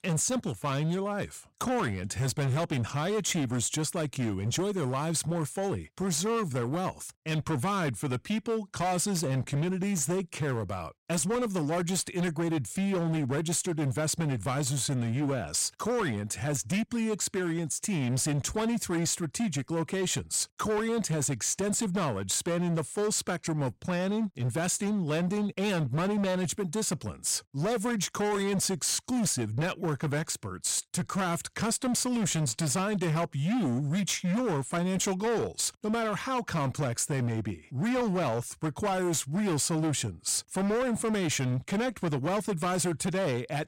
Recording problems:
distortion; slight; 22% of the sound clipped

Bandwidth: 16 kHz